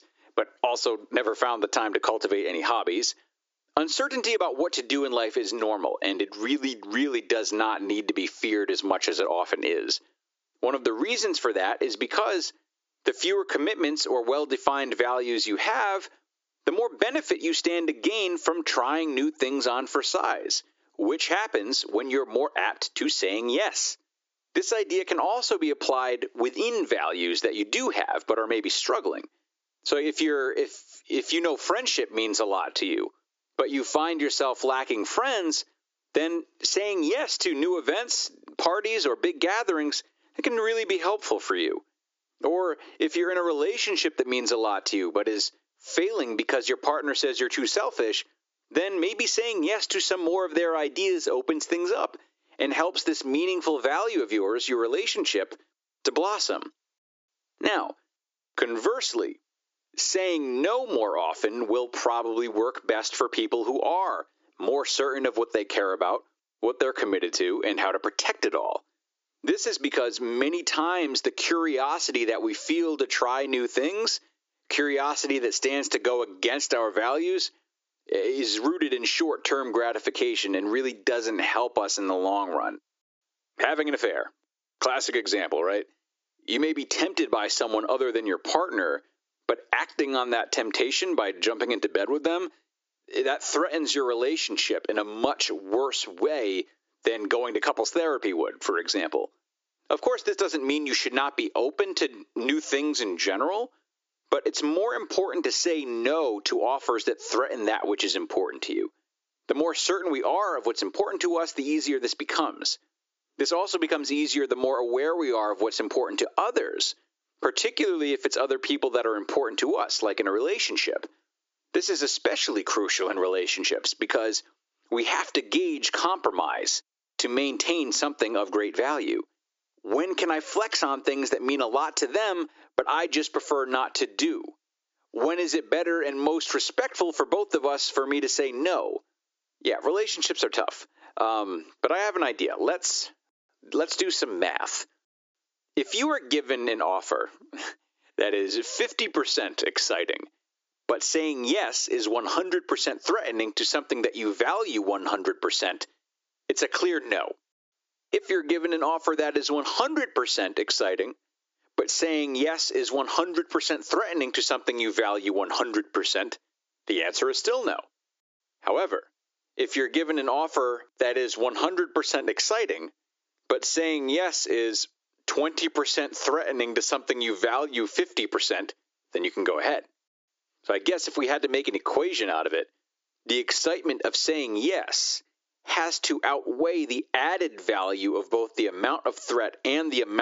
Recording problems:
squashed, flat; heavily
thin; somewhat; fading below 300 Hz
high frequencies cut off; noticeable; nothing above 7.5 kHz
abrupt cut into speech; at the end

